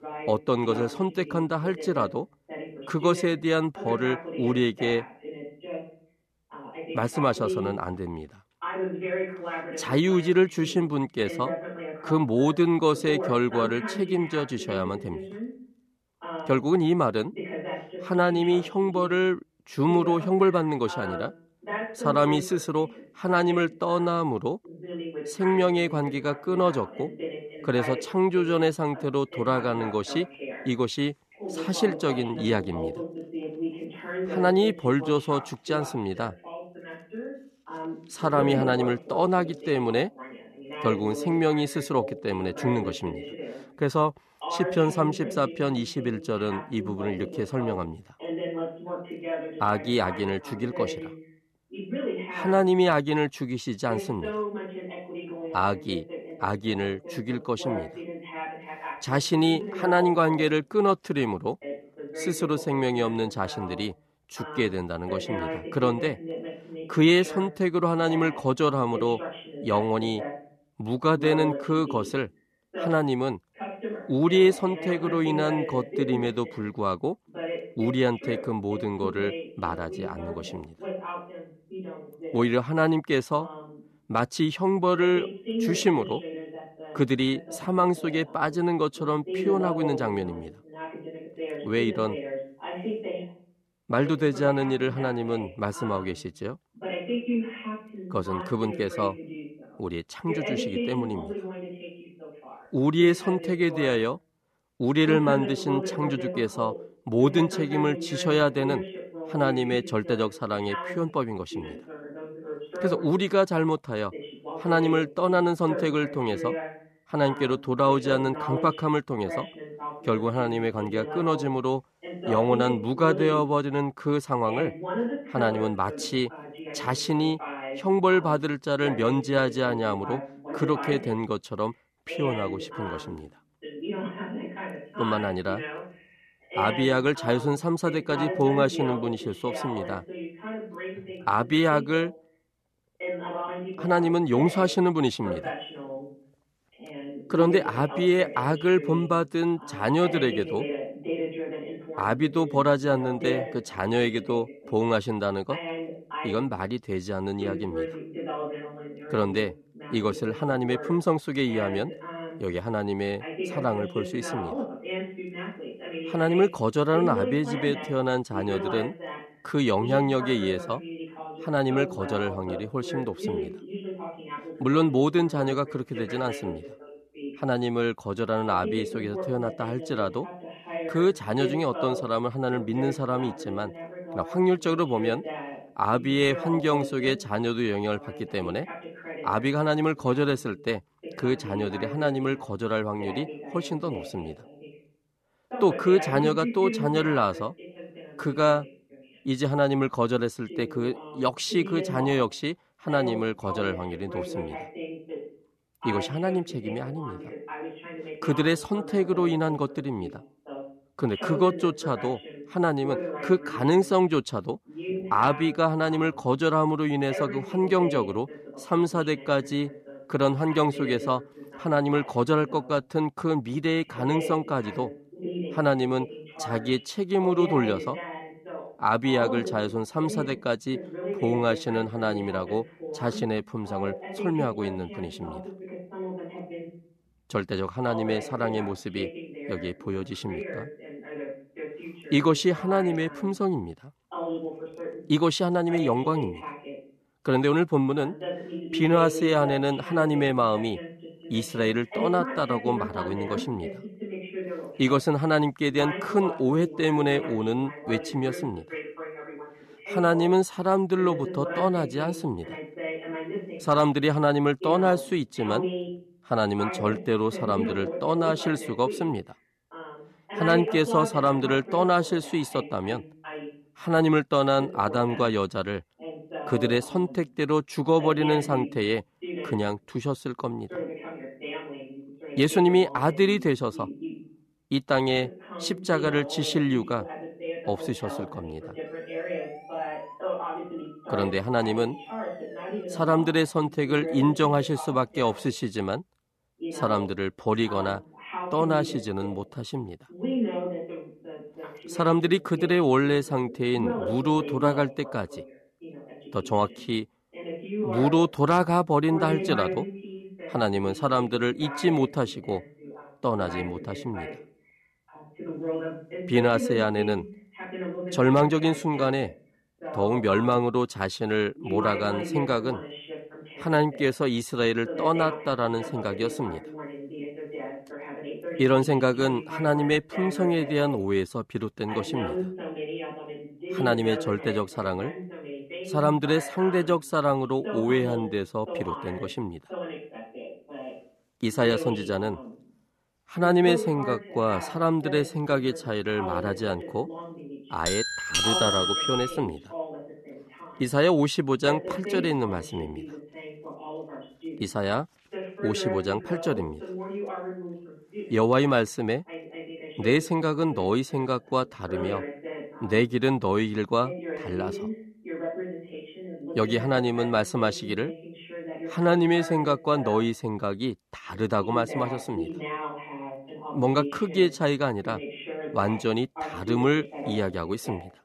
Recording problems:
voice in the background; noticeable; throughout; 10 dB below the speech
siren; faint; from 4:49 to 4:53; peak 20 dB below the speech
doorbell; loud; from 5:48 to 5:49; peak 4 dB above the speech

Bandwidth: 13.5 kHz